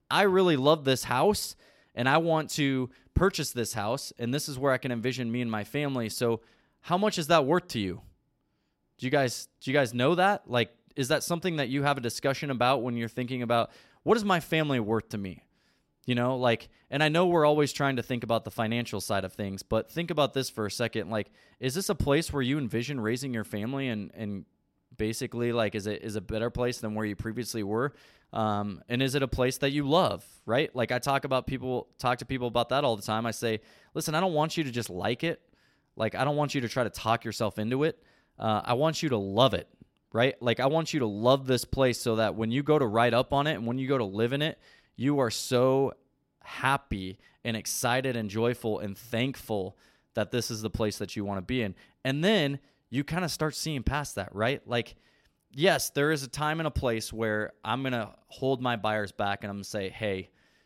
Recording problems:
none

